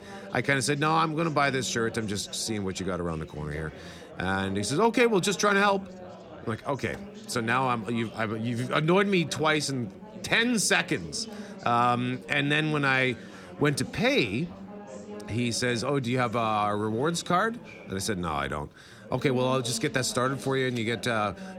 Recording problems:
chatter from many people; noticeable; throughout; 15 dB below the speech

